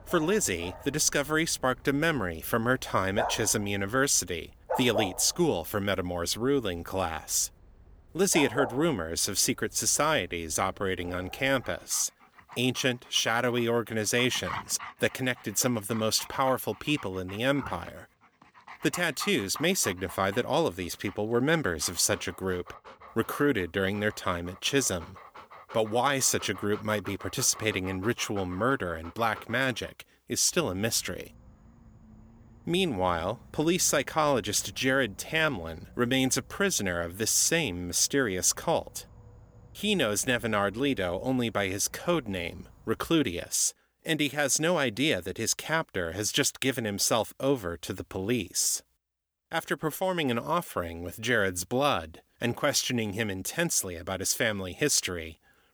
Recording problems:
animal sounds; noticeable; until 43 s; 15 dB below the speech

